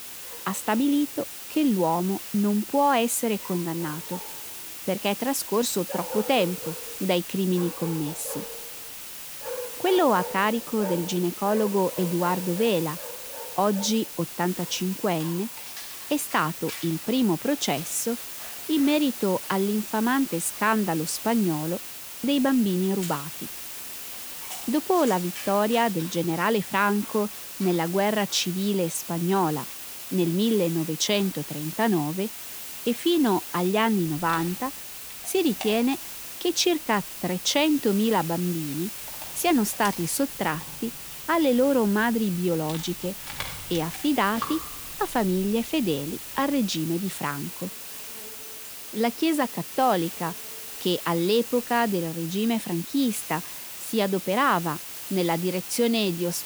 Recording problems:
hiss; loud; throughout; 9 dB below the speech
animal sounds; noticeable; throughout; 15 dB below the speech

